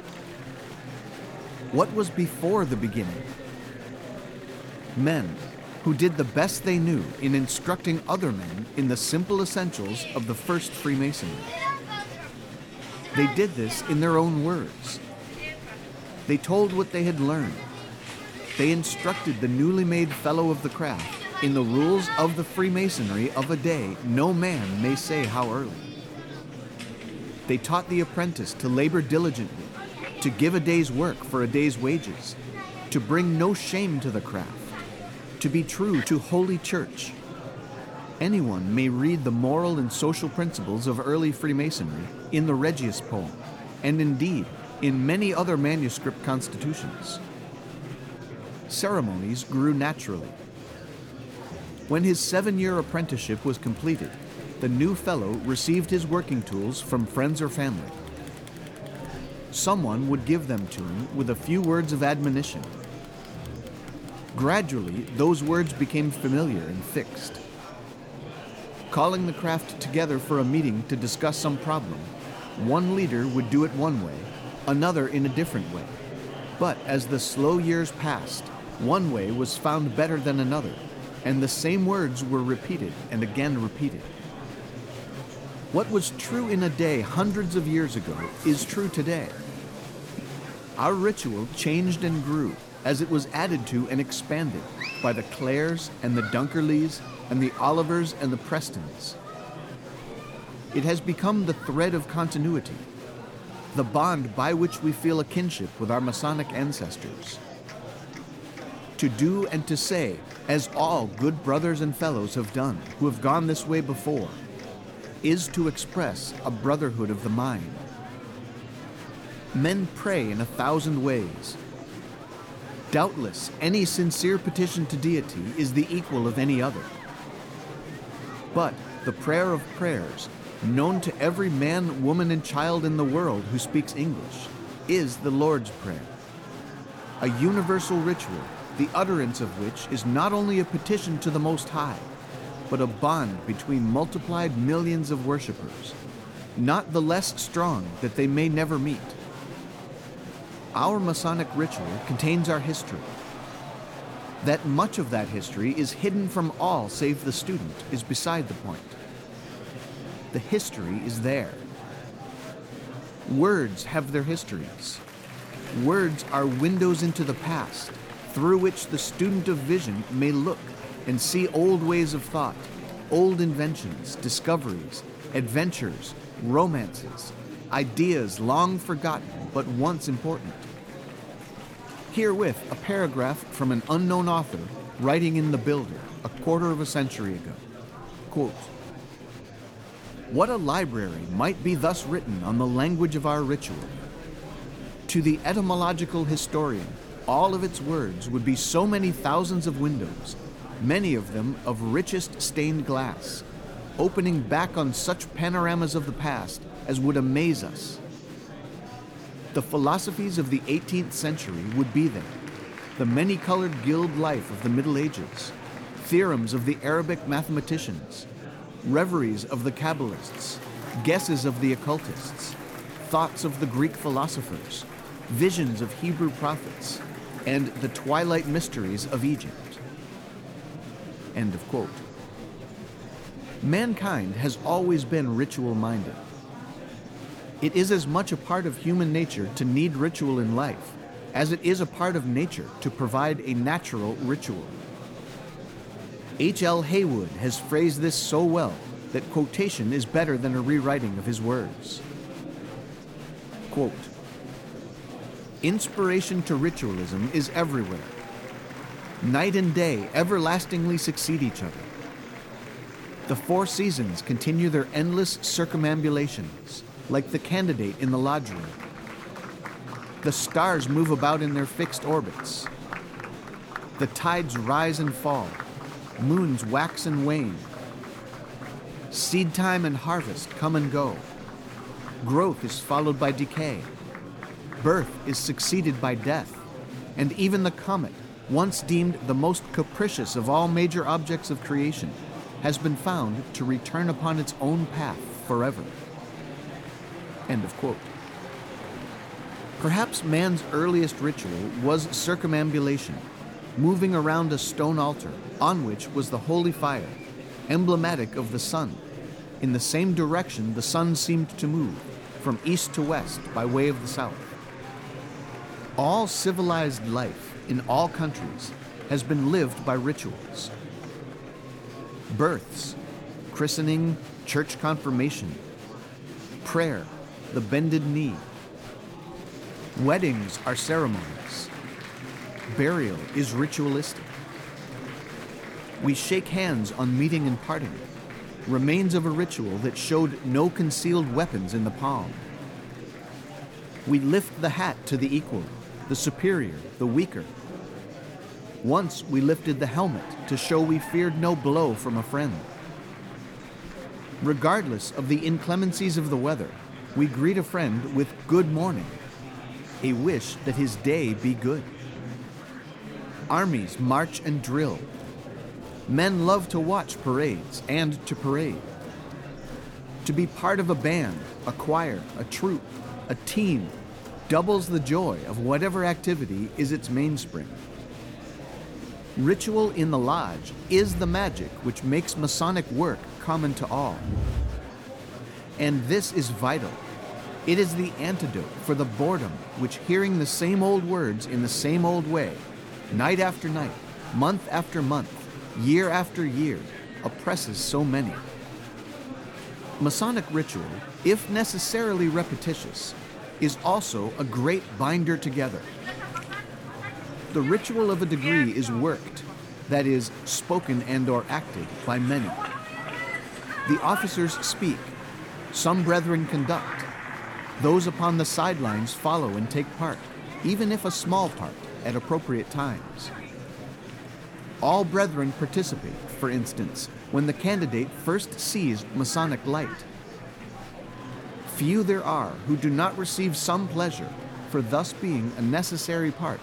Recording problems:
murmuring crowd; noticeable; throughout; 15 dB below the speech

